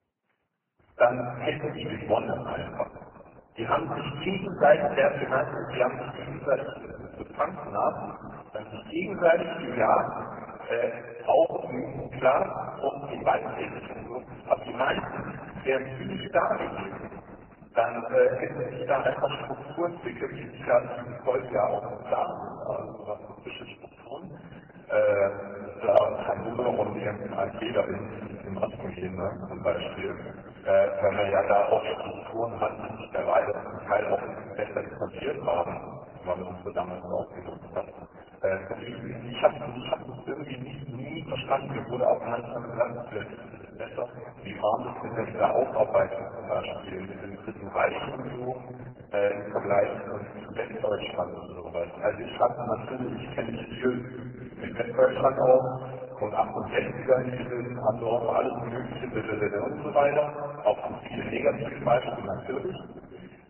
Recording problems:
garbled, watery; badly; nothing above 3 kHz
room echo; noticeable; dies away in 2.2 s
off-mic speech; somewhat distant

